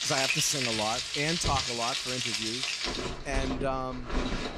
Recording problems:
household noises; very loud; throughout; 3 dB above the speech

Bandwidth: 15.5 kHz